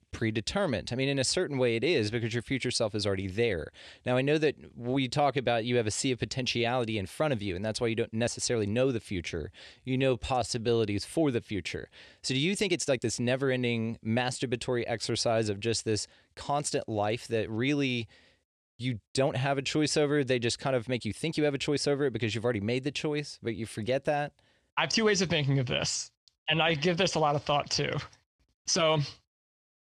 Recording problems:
uneven, jittery; strongly; from 8 to 29 s

